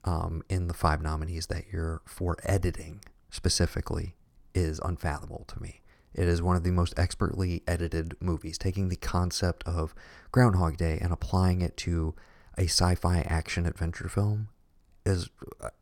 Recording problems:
none

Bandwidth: 18 kHz